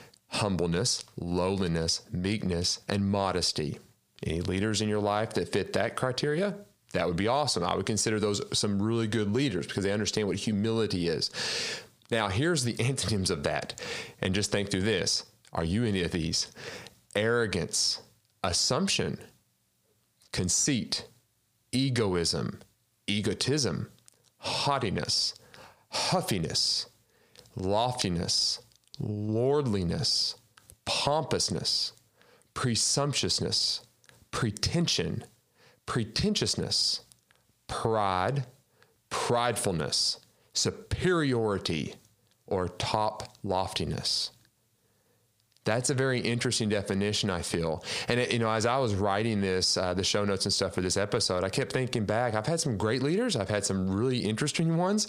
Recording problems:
squashed, flat; heavily

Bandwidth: 15 kHz